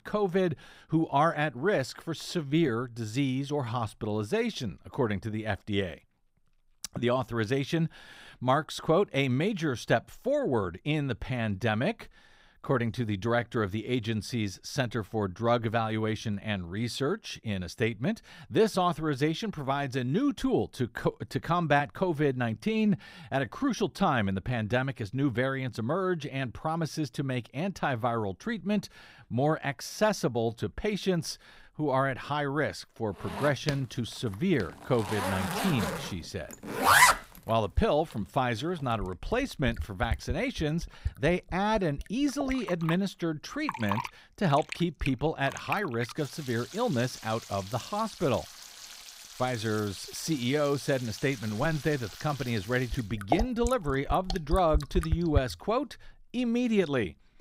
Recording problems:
household noises; loud; from 33 s on; 3 dB below the speech

